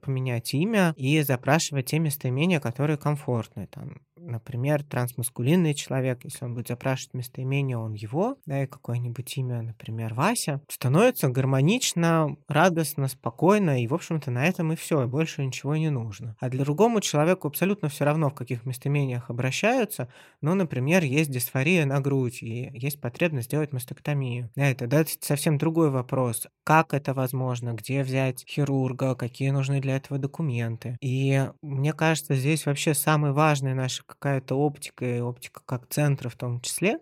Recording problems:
none

